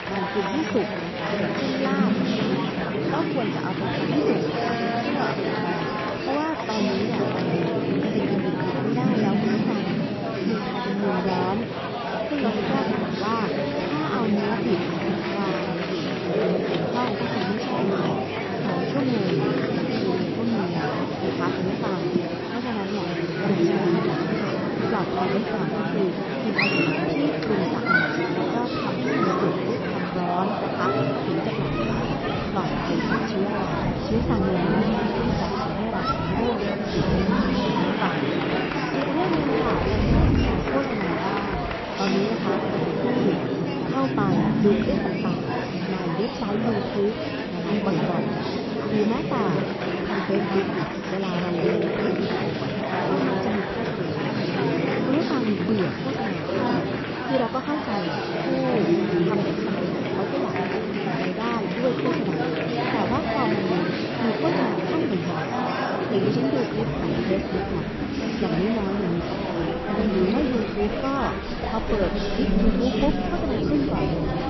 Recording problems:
garbled, watery; slightly; nothing above 5.5 kHz
murmuring crowd; very loud; throughout; 4 dB above the speech
rain or running water; loud; throughout; 7 dB below the speech

